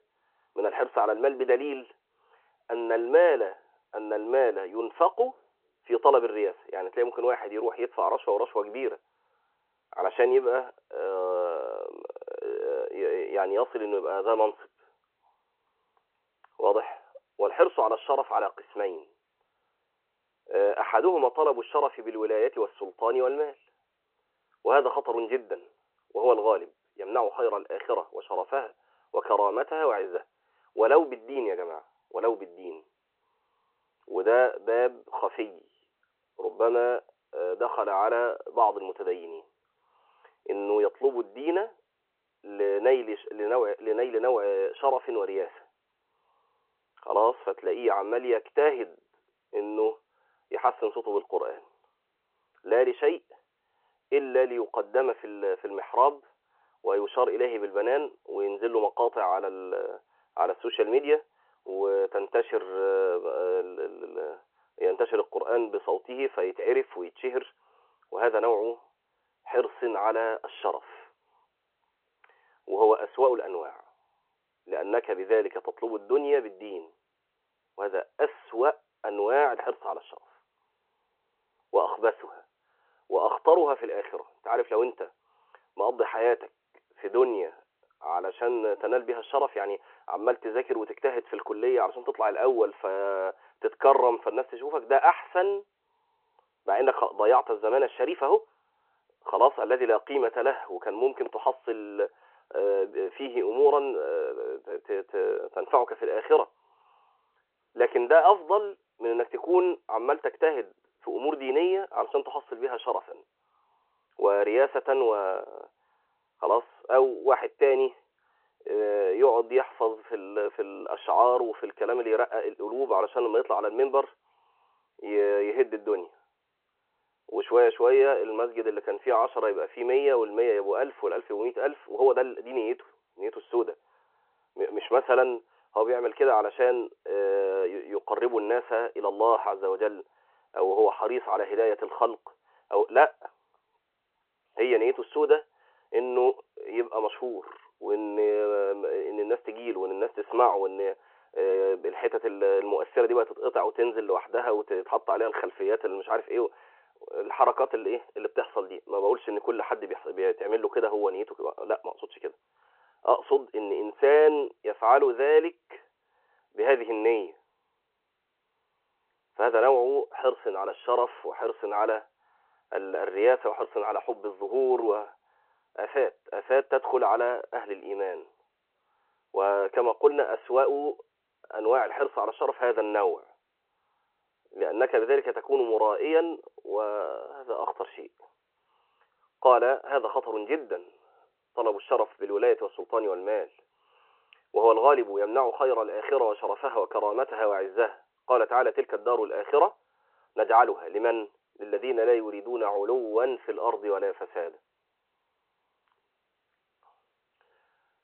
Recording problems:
phone-call audio

